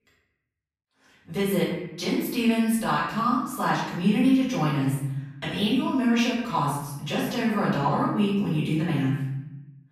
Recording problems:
off-mic speech; far
room echo; noticeable; dies away in 1 s

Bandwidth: 14.5 kHz